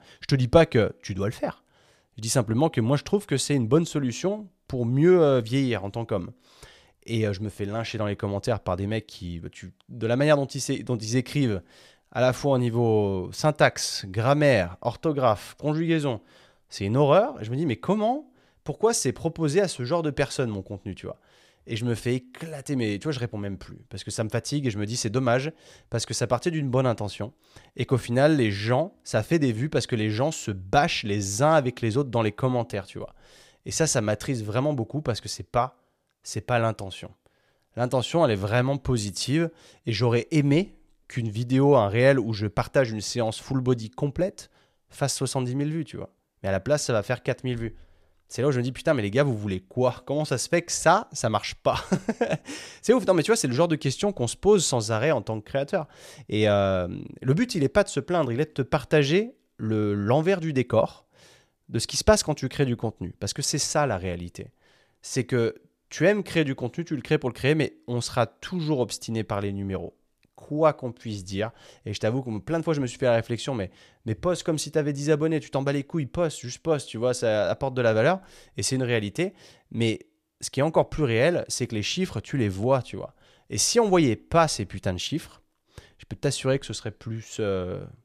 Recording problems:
none

